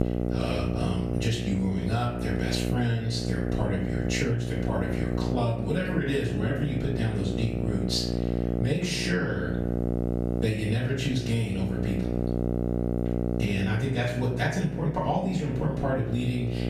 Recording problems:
off-mic speech; far
room echo; noticeable; dies away in 0.5 s
squashed, flat; somewhat
electrical hum; loud; throughout; 60 Hz, 4 dB below the speech

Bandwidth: 14.5 kHz